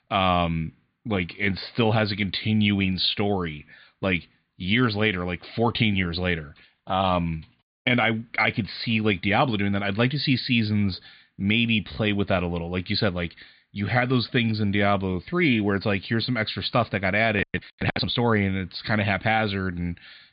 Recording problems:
high frequencies cut off; severe; nothing above 4.5 kHz

